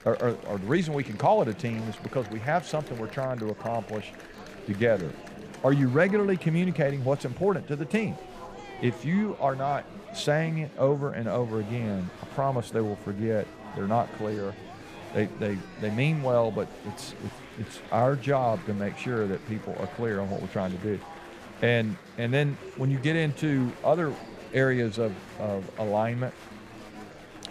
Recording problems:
murmuring crowd; noticeable; throughout; 15 dB below the speech

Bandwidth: 14.5 kHz